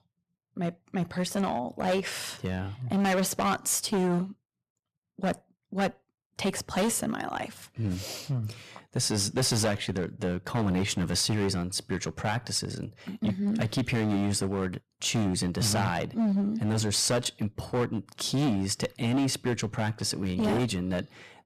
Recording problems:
distortion; heavy; 11% of the sound clipped

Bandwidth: 14.5 kHz